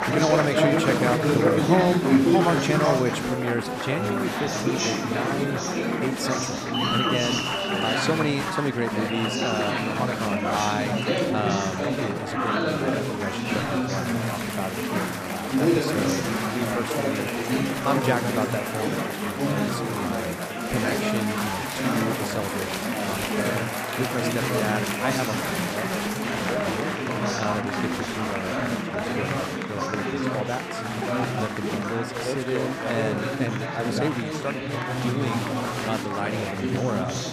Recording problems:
chatter from many people; very loud; throughout; 4 dB above the speech

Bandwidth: 14.5 kHz